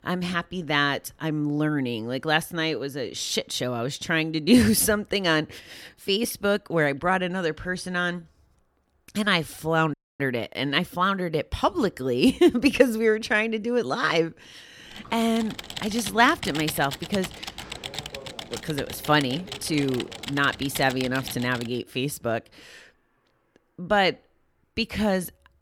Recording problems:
audio cutting out; at 10 s
keyboard typing; noticeable; from 15 to 22 s; peak 7 dB below the speech

